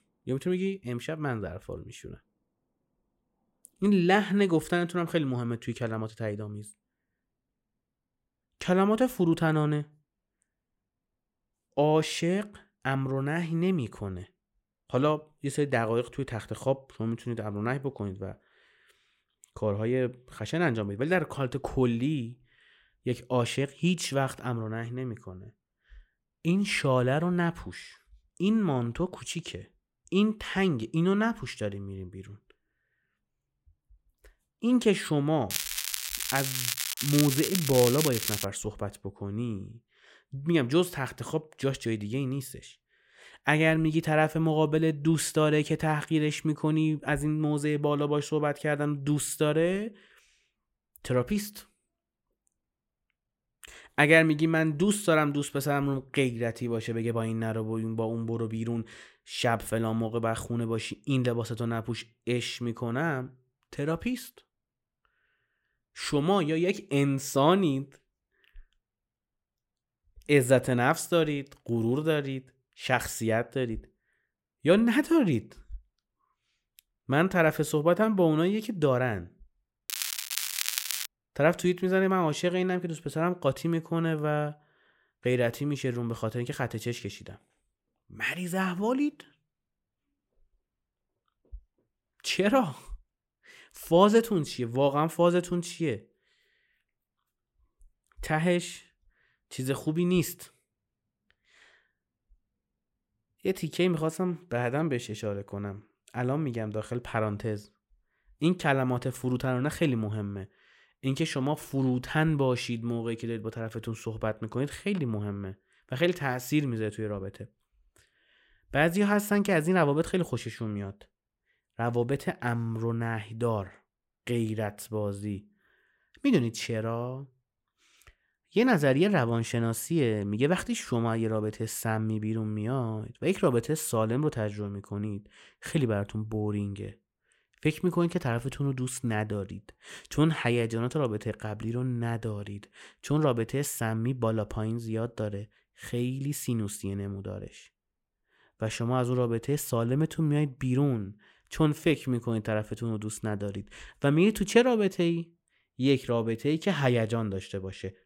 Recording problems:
crackling; loud; from 36 to 38 s and from 1:20 to 1:21; 2 dB below the speech

